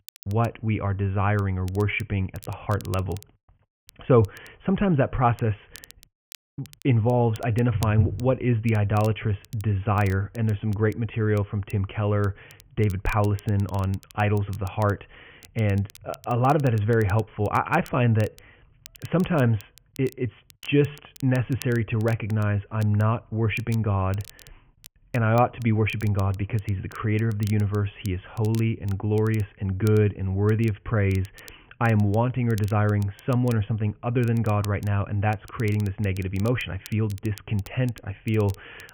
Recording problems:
high frequencies cut off; severe; nothing above 3 kHz
crackle, like an old record; faint; 25 dB below the speech

